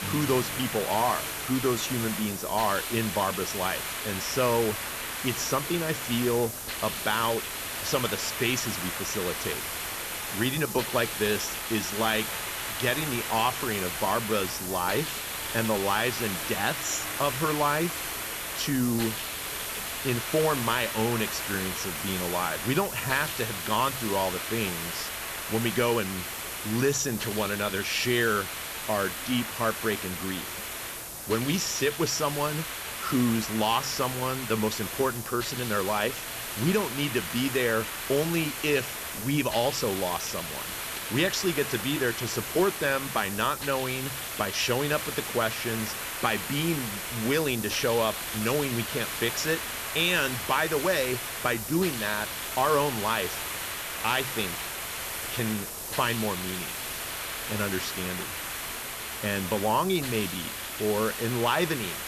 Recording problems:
high frequencies cut off; noticeable; nothing above 8 kHz
hiss; loud; throughout; 4 dB below the speech
background music; faint; until 19 s; 20 dB below the speech
background chatter; faint; throughout; 3 voices, 25 dB below the speech
crackling; very faint; at 1 s; 30 dB below the speech

